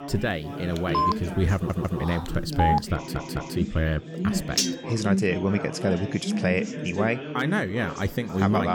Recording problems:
background chatter; loud; throughout; 3 voices, 5 dB below the speech
phone ringing; loud; from 1 to 3 s; peak 2 dB above the speech
audio stuttering; at 1.5 s and at 3 s
clattering dishes; loud; at 4.5 s; peak 2 dB above the speech
abrupt cut into speech; at the end

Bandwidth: 18 kHz